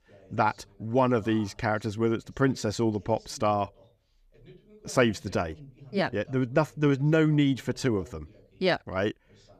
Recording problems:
voice in the background; faint; throughout; 25 dB below the speech

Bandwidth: 14.5 kHz